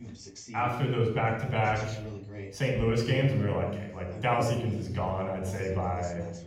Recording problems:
room echo; noticeable; dies away in 0.9 s
off-mic speech; somewhat distant
voice in the background; noticeable; throughout; 15 dB below the speech

